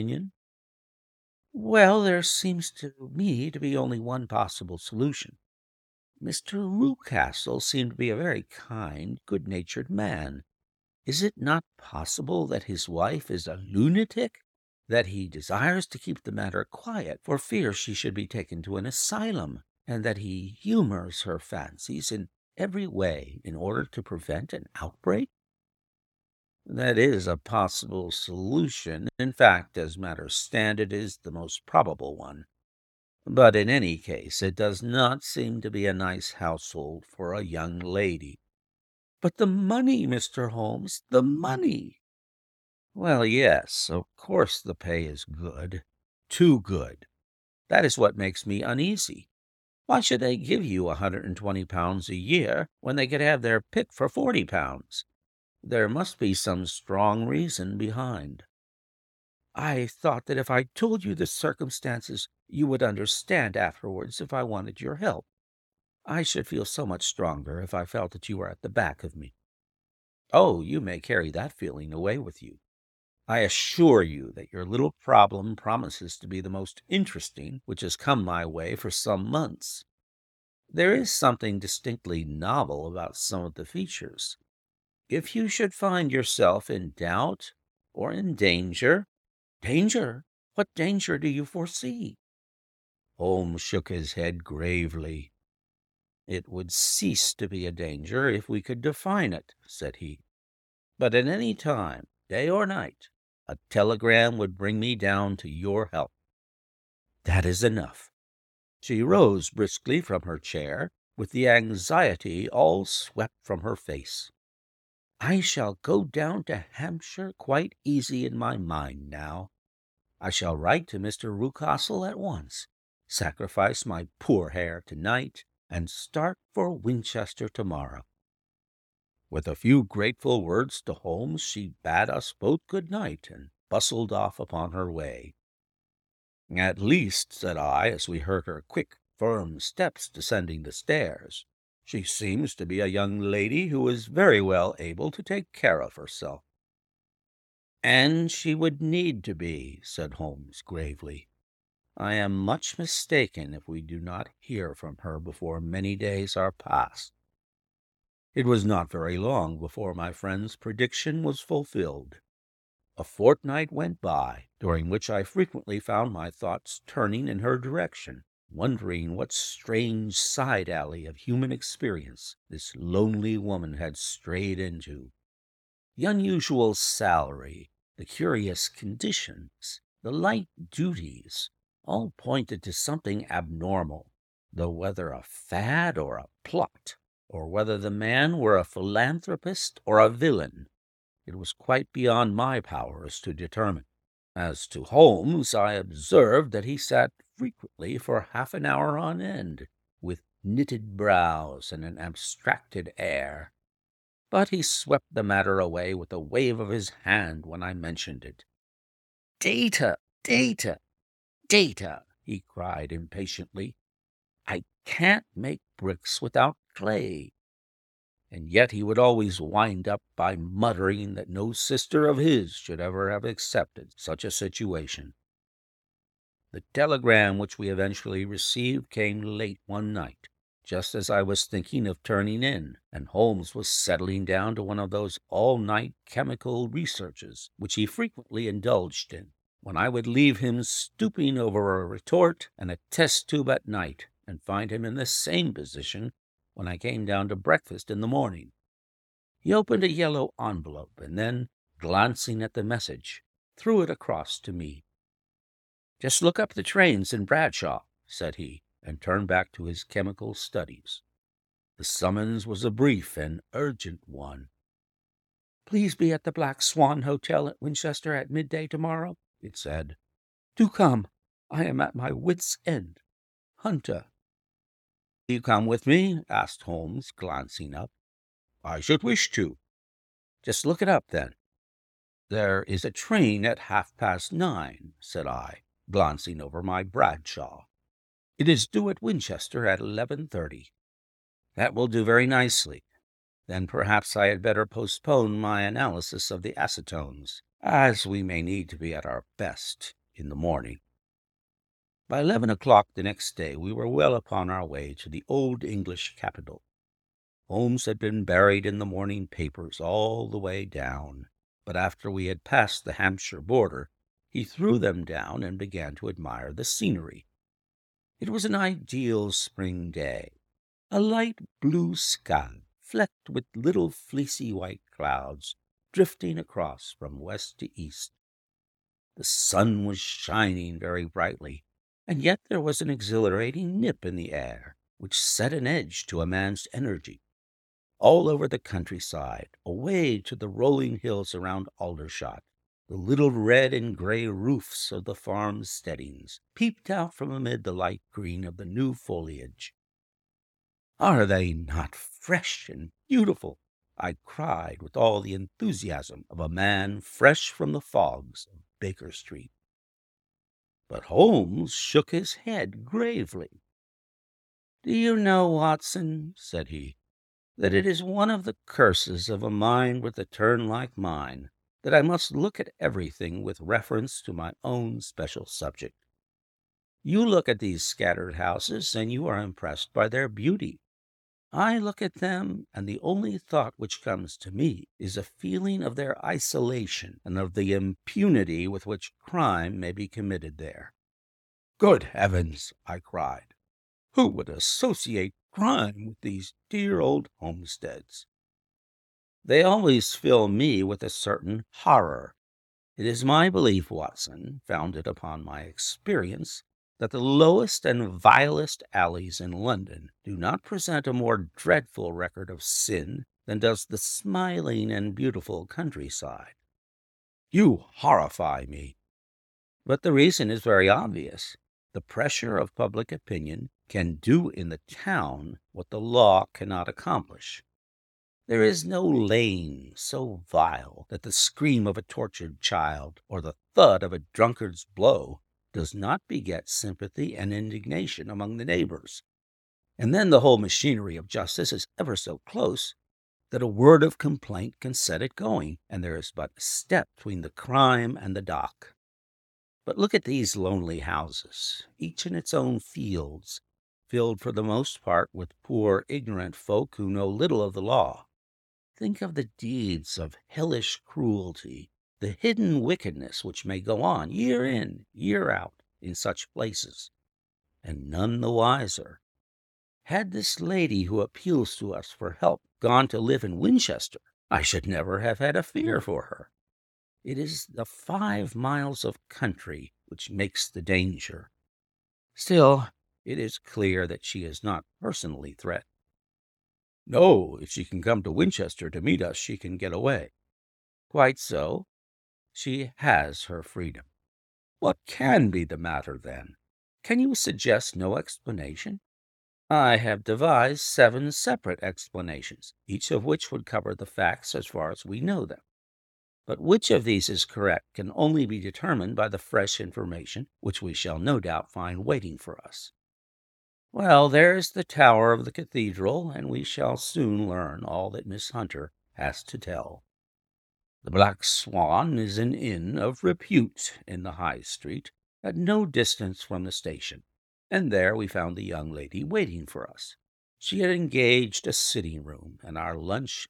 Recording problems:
abrupt cut into speech; at the start

